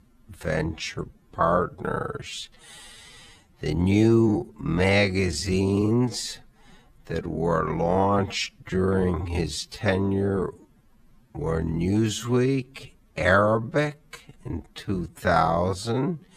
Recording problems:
wrong speed, natural pitch; too slow; 0.5 times normal speed

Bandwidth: 14.5 kHz